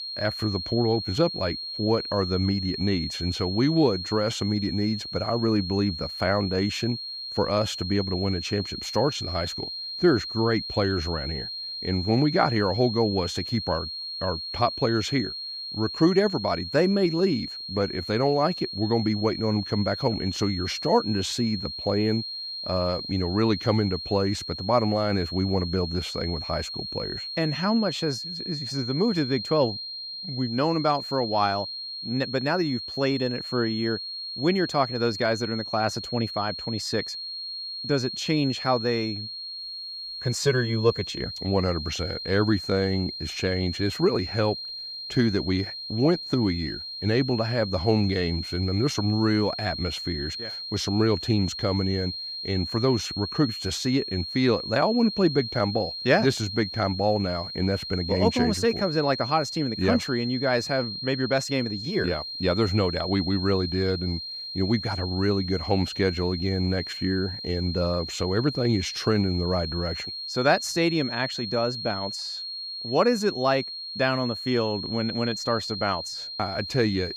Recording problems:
high-pitched whine; loud; throughout; 4.5 kHz, 6 dB below the speech

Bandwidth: 15.5 kHz